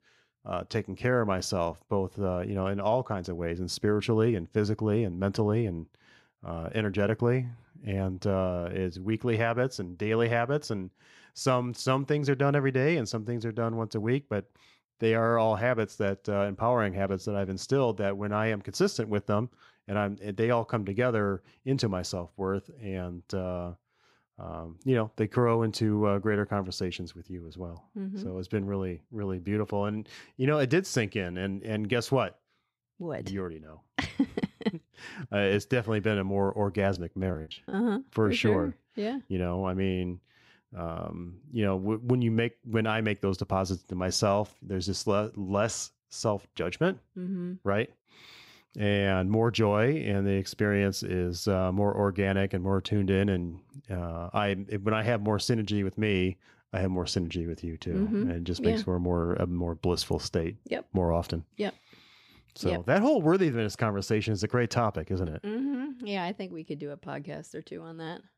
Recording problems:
choppy; very; from 36 to 38 s; 17% of the speech affected

